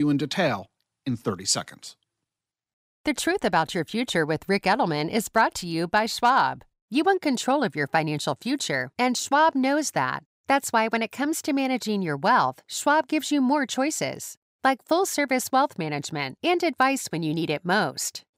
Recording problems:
abrupt cut into speech; at the start

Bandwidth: 15.5 kHz